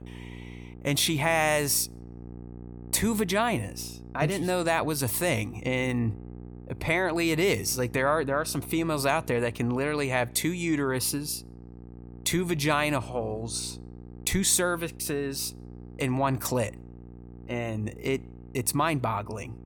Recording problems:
electrical hum; faint; throughout; 60 Hz, 25 dB below the speech

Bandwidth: 18.5 kHz